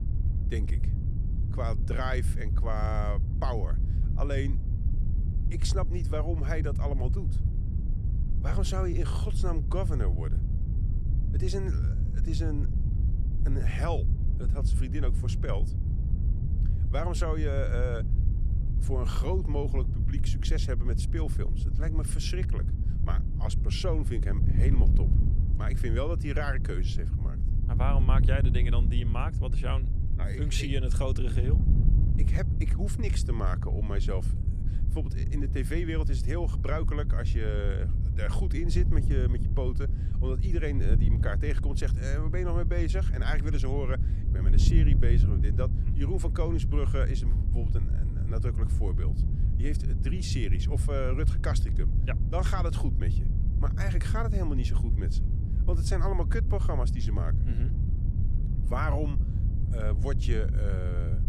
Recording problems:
wind noise on the microphone; heavy; 7 dB below the speech

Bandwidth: 13.5 kHz